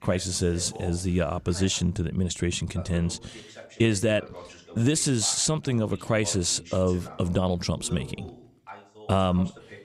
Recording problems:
voice in the background; noticeable; throughout; 20 dB below the speech

